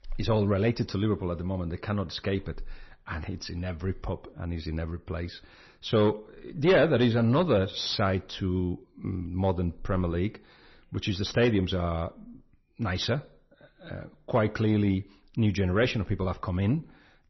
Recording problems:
distortion; slight; 10 dB below the speech
garbled, watery; slightly; nothing above 6 kHz

